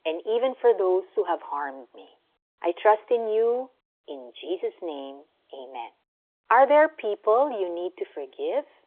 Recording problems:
phone-call audio; nothing above 3.5 kHz

